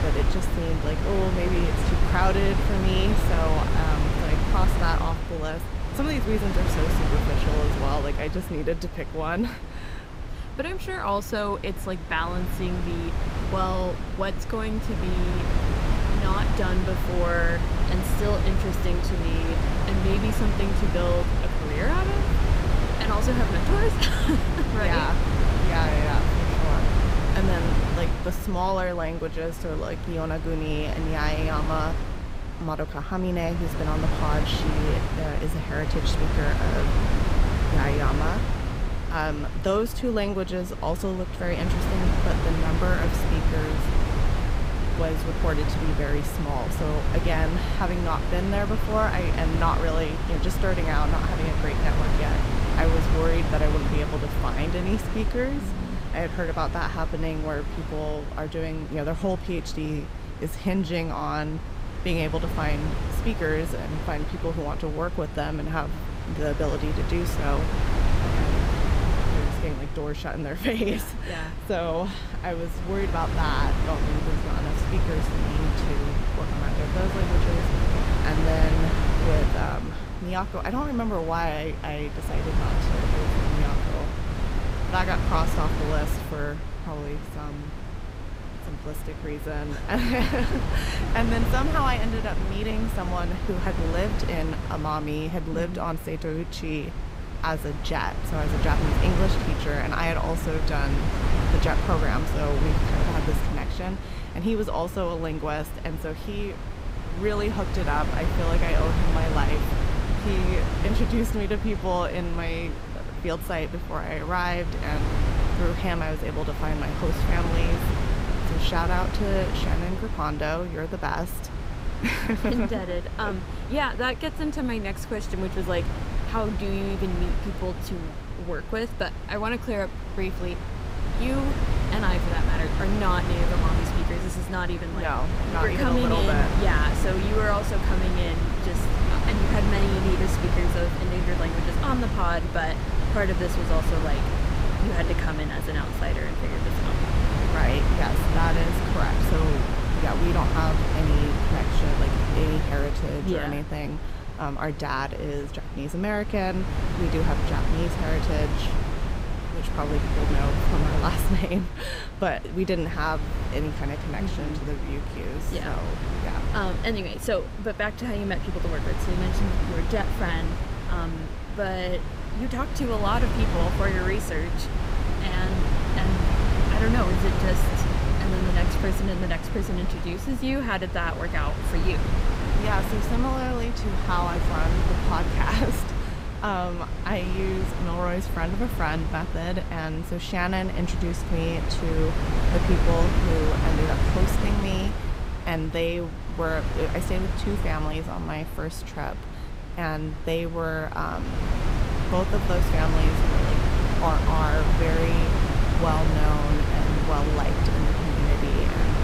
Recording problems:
wind noise on the microphone; heavy; 3 dB below the speech

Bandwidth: 15.5 kHz